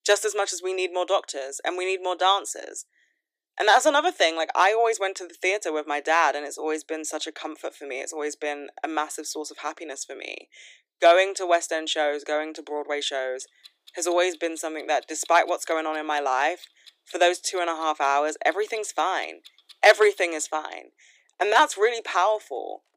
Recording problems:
thin; very; fading below 300 Hz
household noises; faint; from 13 s on; 25 dB below the speech

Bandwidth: 15 kHz